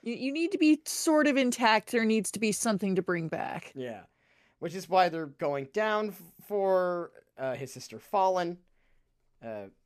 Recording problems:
none

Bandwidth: 14.5 kHz